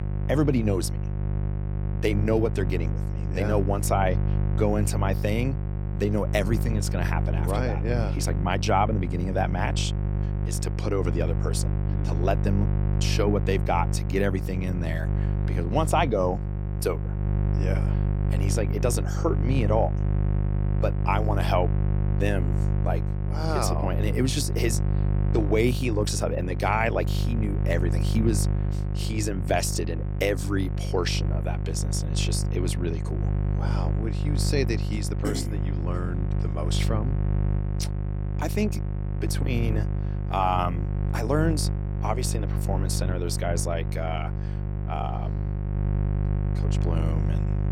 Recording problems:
electrical hum; loud; throughout; 50 Hz, 9 dB below the speech

